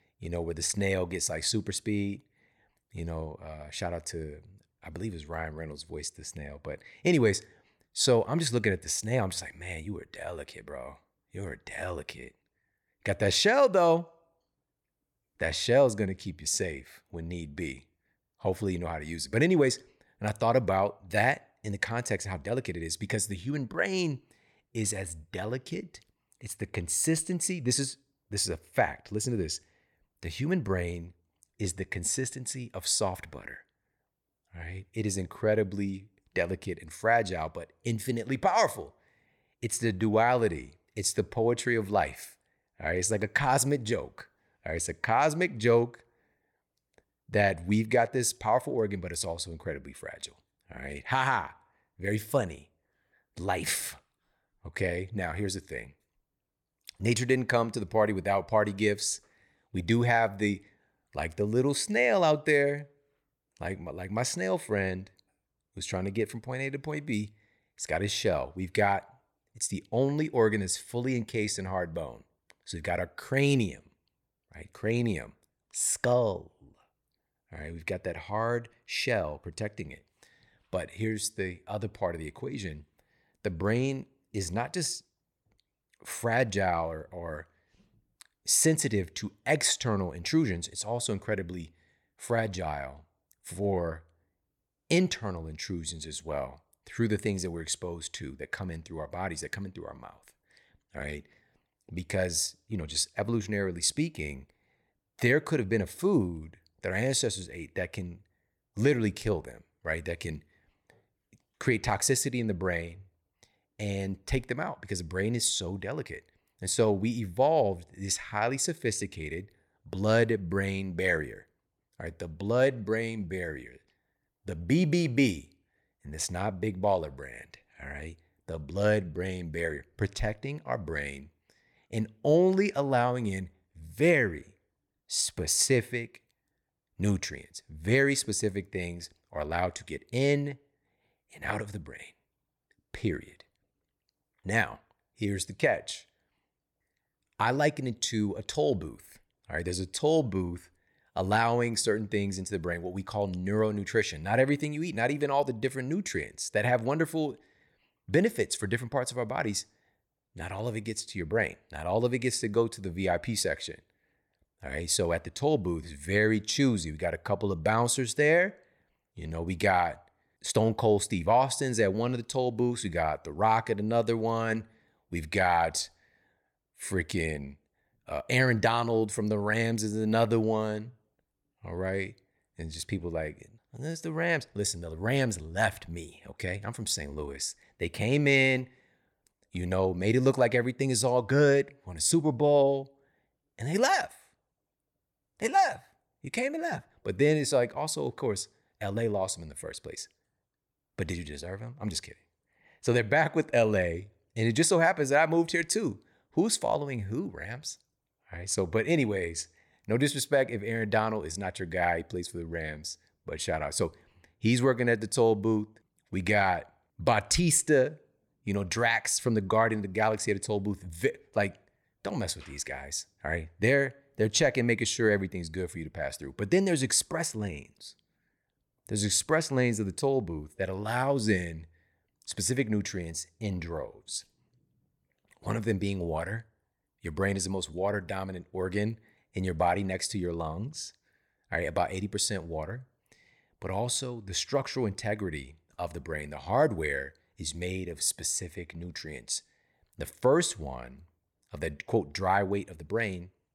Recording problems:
none

